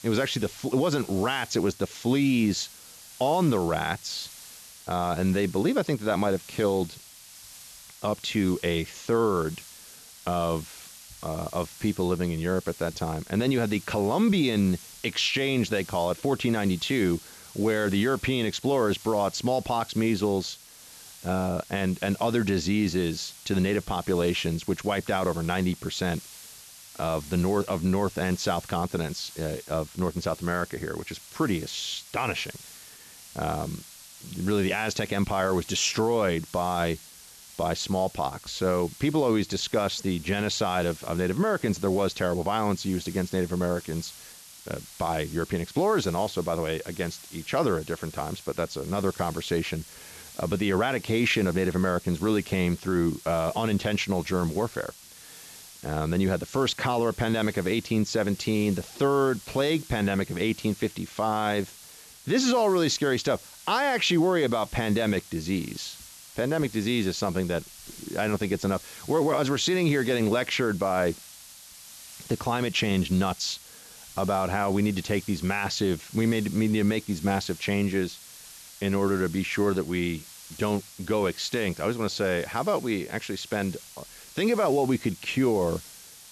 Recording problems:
high frequencies cut off; noticeable; nothing above 7.5 kHz
hiss; noticeable; throughout; 15 dB below the speech

